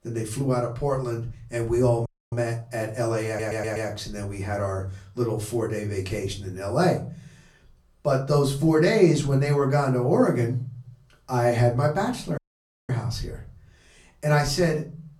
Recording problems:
off-mic speech; far
room echo; very slight; dies away in 0.4 s
audio cutting out; at 2 s and at 12 s for 0.5 s
audio stuttering; at 3.5 s

